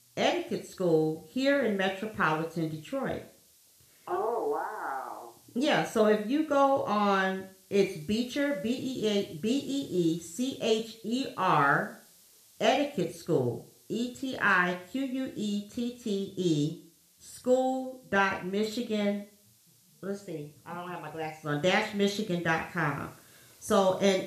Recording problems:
room echo; slight; dies away in 0.5 s
off-mic speech; somewhat distant
hiss; faint; throughout; 30 dB below the speech

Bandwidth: 14.5 kHz